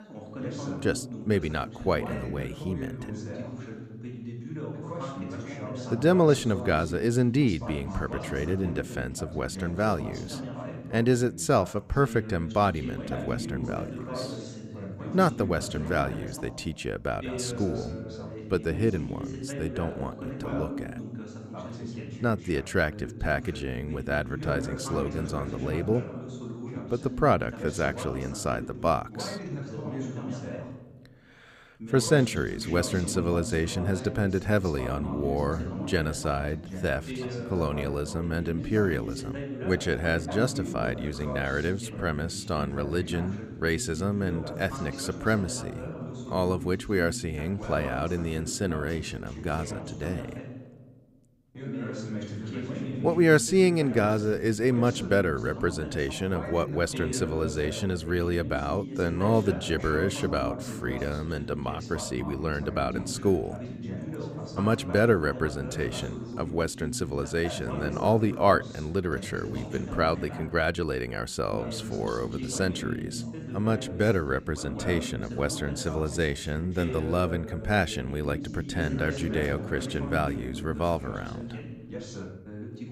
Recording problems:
background chatter; loud; throughout; 2 voices, 8 dB below the speech

